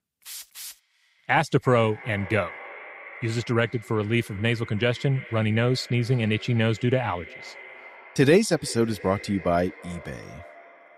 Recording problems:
echo of what is said; noticeable; throughout; 340 ms later, 15 dB below the speech

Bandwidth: 15.5 kHz